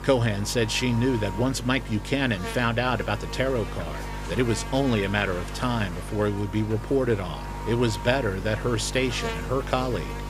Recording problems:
electrical hum; loud; throughout; 50 Hz, 10 dB below the speech

